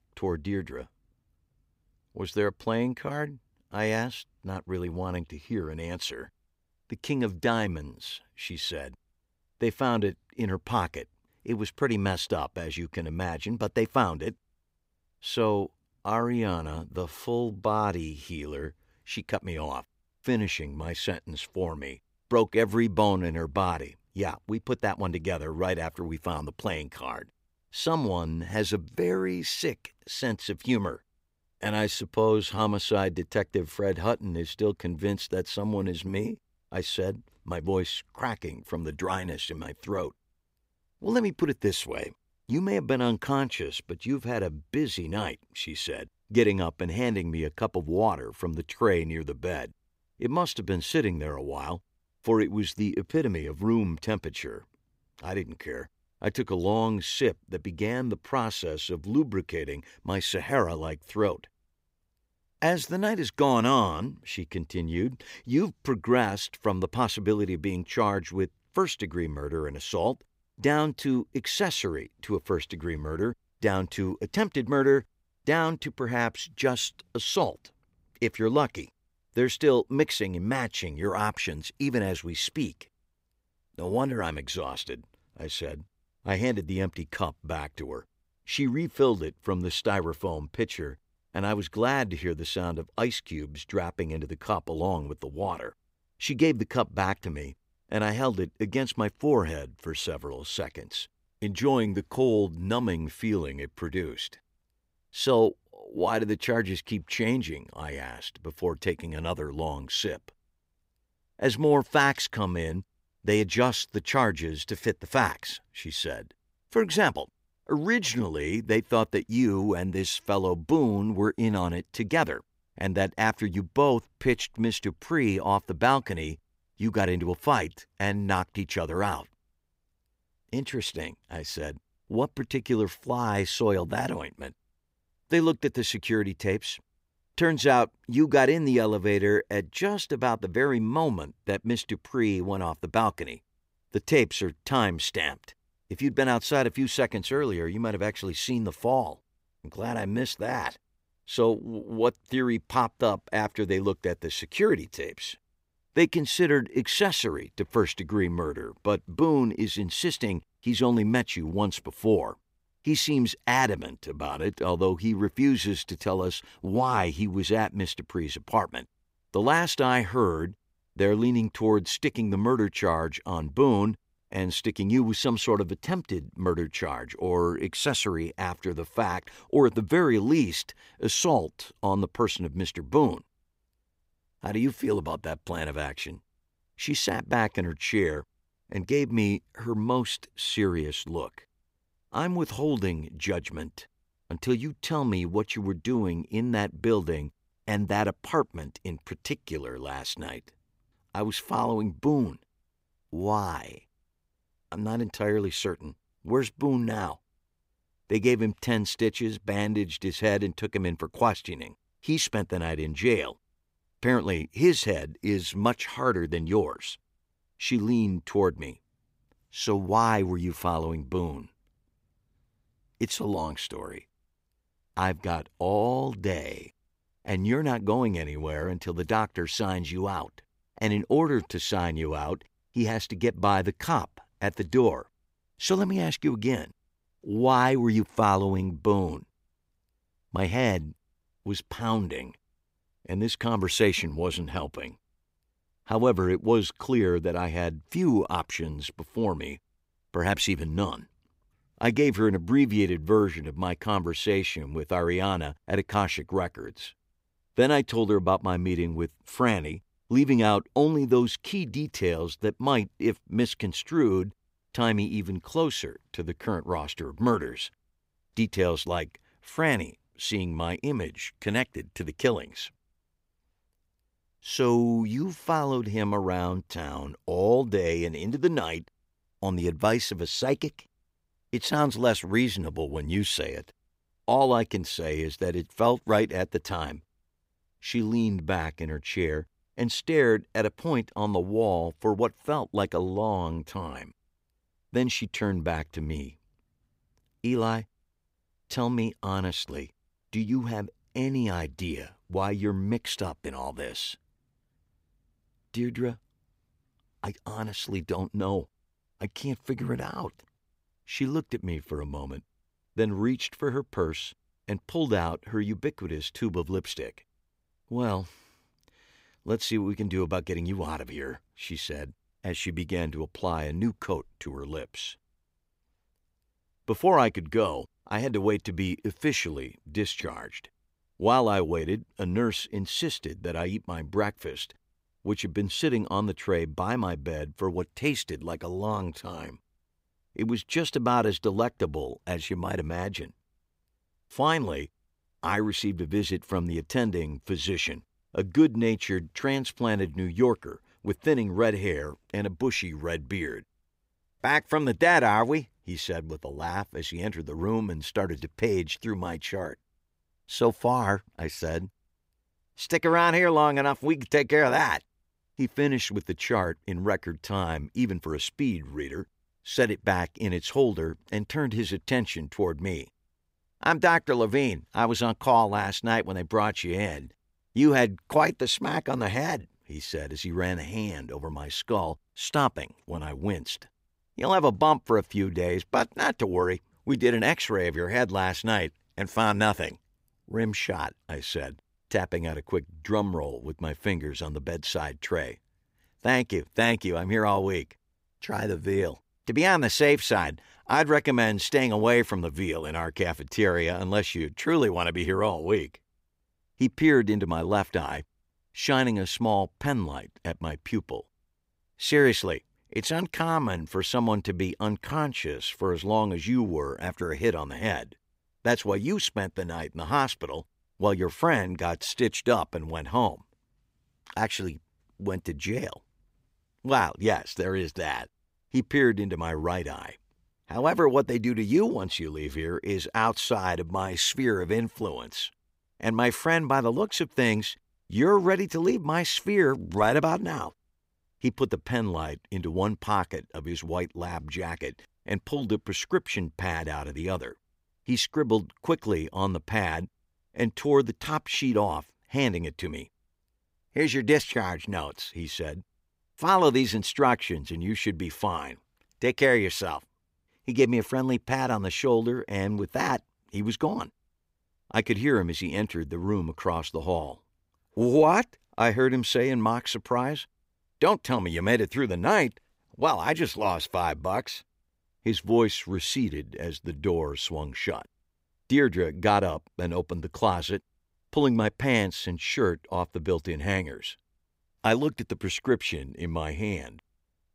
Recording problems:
none

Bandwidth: 15.5 kHz